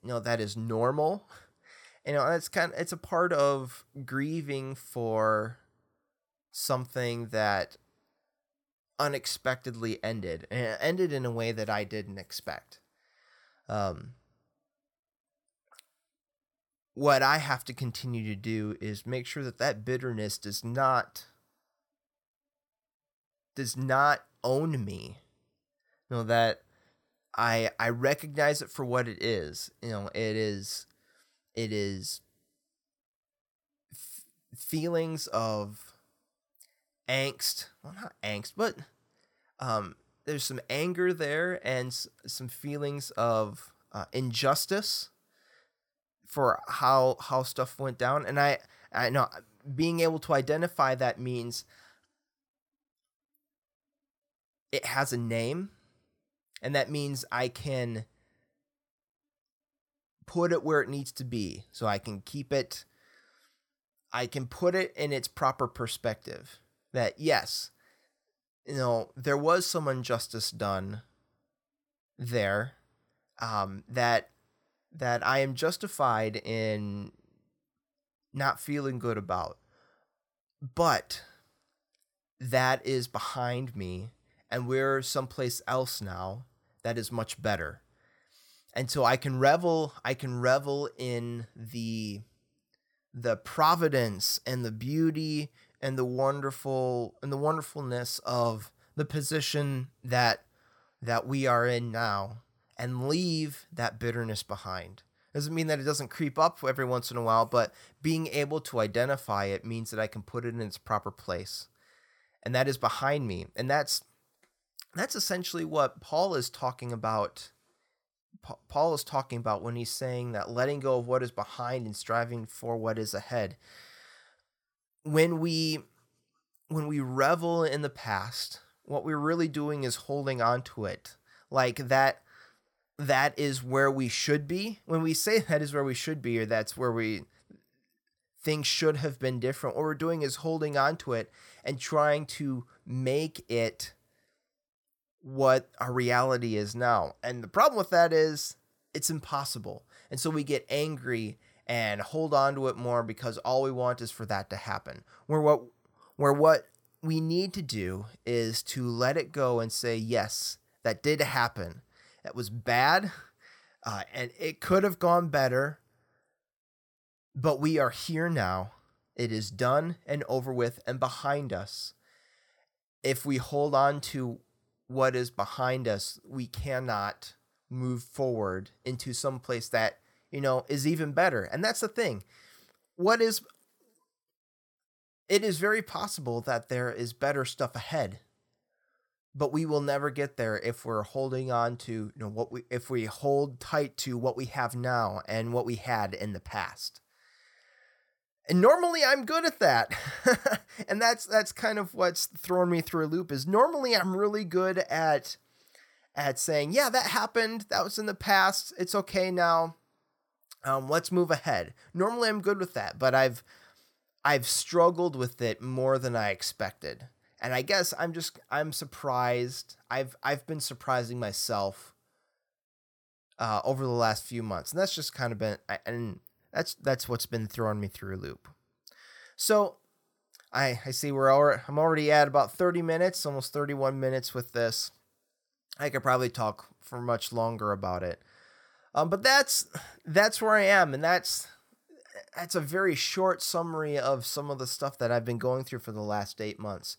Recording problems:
none

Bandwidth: 17.5 kHz